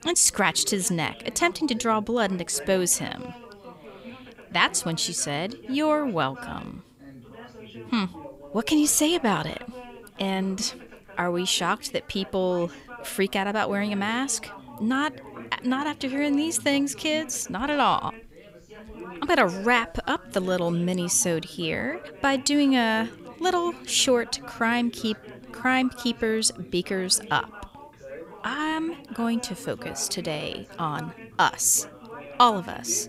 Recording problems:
background chatter; noticeable; throughout; 3 voices, 20 dB below the speech

